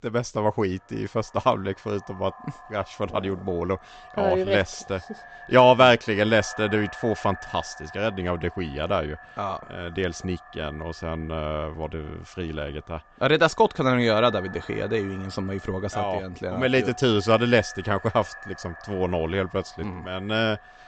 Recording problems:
high frequencies cut off; noticeable; nothing above 8 kHz
echo of what is said; faint; throughout; 140 ms later, 20 dB below the speech

